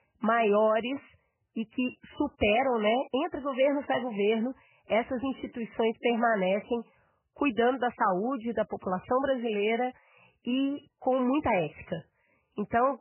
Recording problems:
garbled, watery; badly; nothing above 3 kHz

